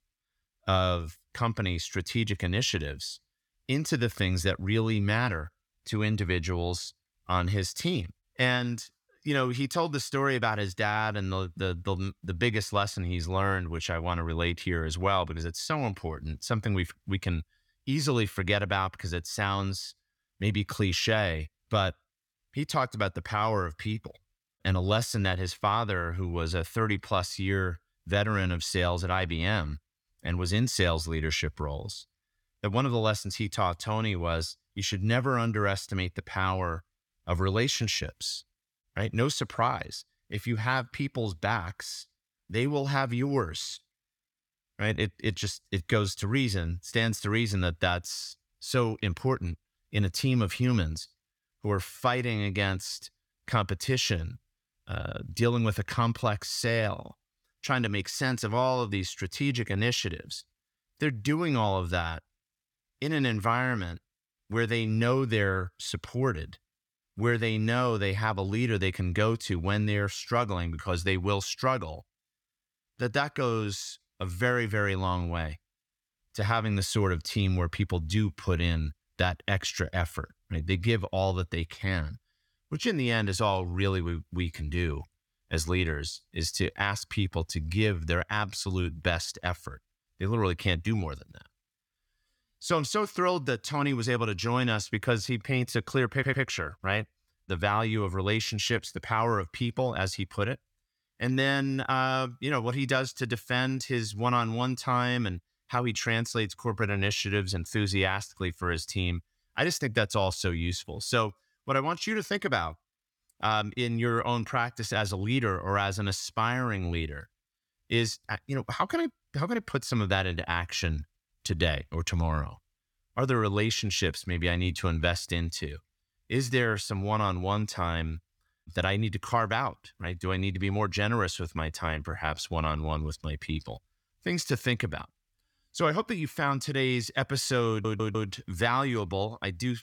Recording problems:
audio stuttering; at 1:36 and at 2:18

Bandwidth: 18 kHz